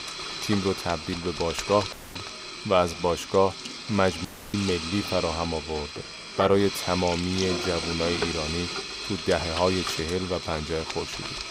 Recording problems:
household noises; loud; throughout; 5 dB below the speech
chatter from many people; faint; throughout; 30 dB below the speech
audio cutting out; at 2 s and at 4.5 s

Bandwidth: 15.5 kHz